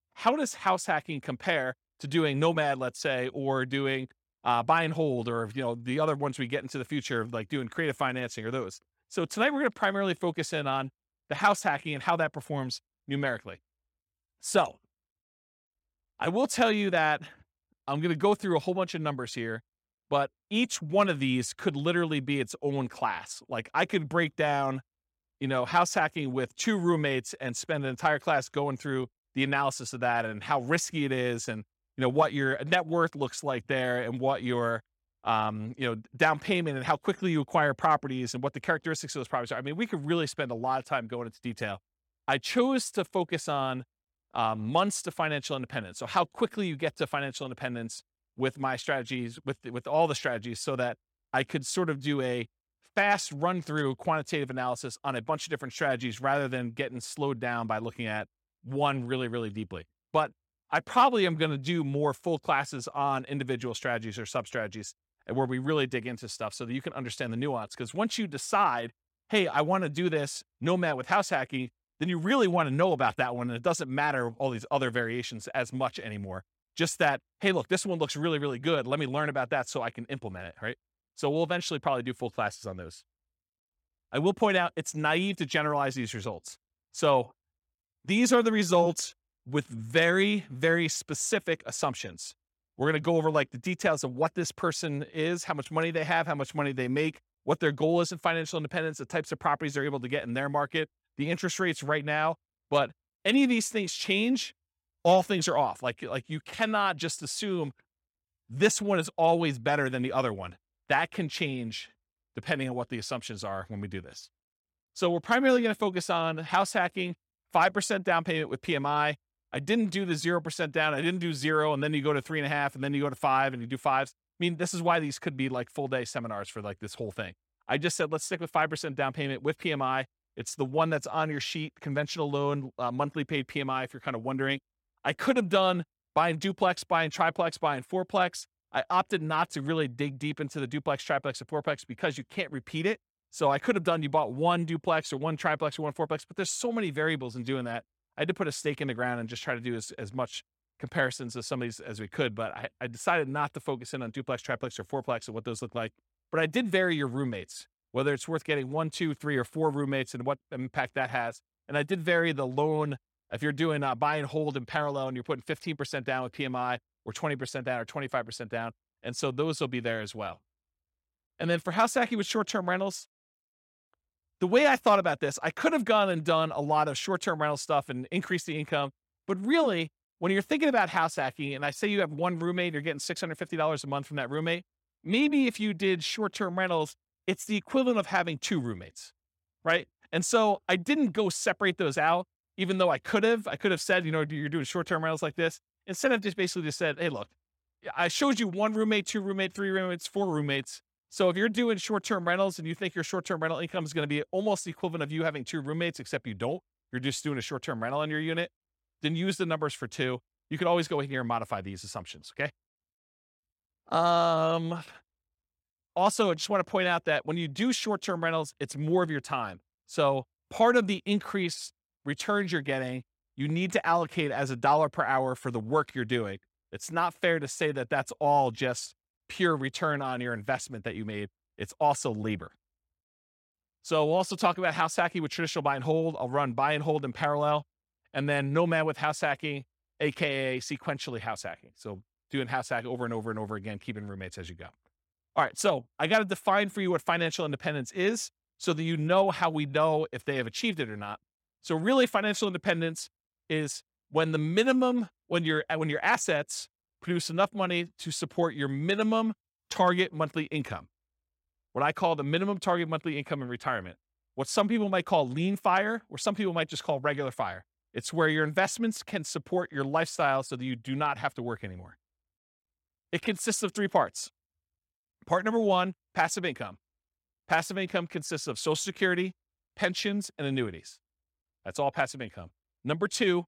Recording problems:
none

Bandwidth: 16.5 kHz